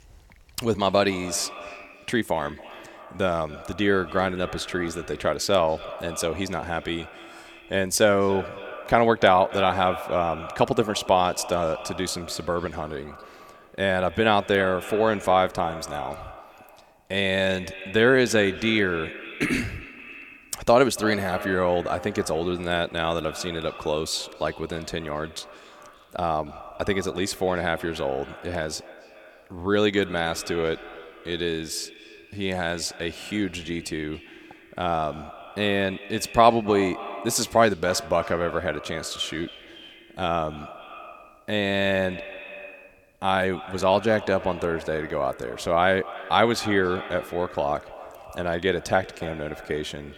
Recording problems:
echo of what is said; noticeable; throughout; 280 ms later, 15 dB below the speech

